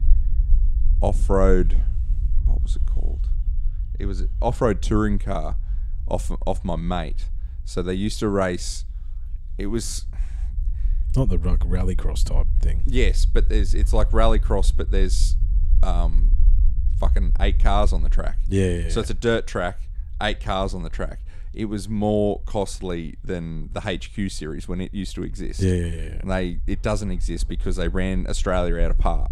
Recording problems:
low rumble; faint; throughout; 20 dB below the speech

